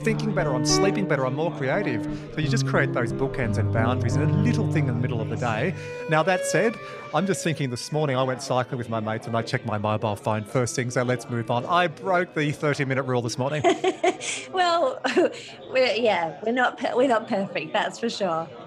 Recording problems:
background music; loud; throughout; 3 dB below the speech
background chatter; noticeable; throughout; 4 voices, 15 dB below the speech

